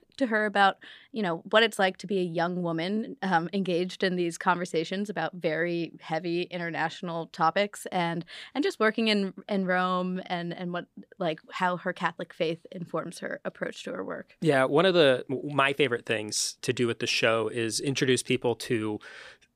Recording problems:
none

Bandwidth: 15 kHz